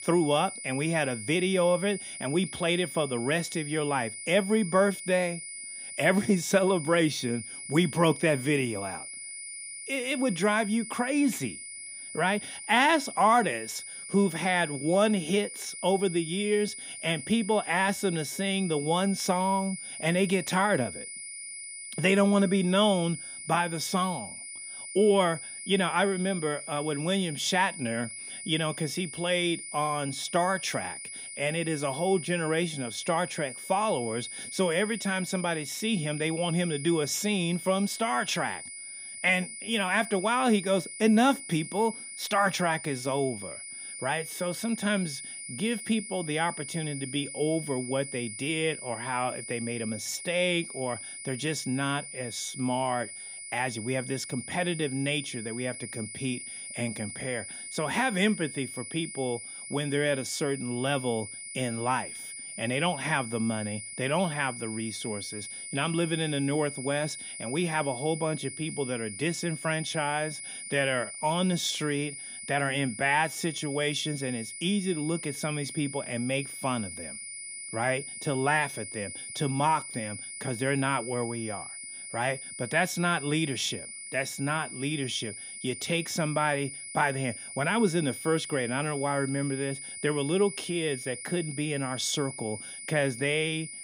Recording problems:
high-pitched whine; loud; throughout; 9.5 kHz, 9 dB below the speech

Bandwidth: 15.5 kHz